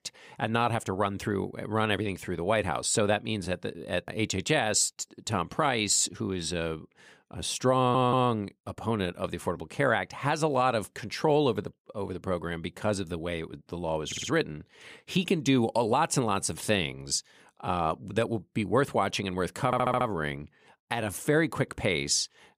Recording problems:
audio stuttering; at 8 s, at 14 s and at 20 s

